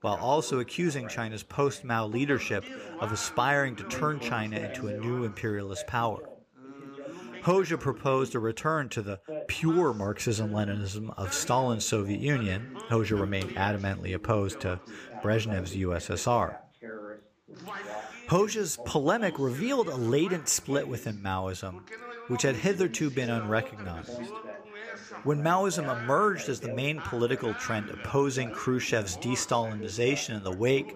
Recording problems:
background chatter; noticeable; throughout; 2 voices, 15 dB below the speech

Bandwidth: 15 kHz